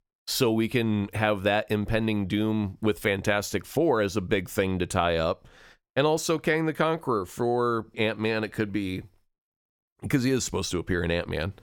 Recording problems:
none

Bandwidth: 18.5 kHz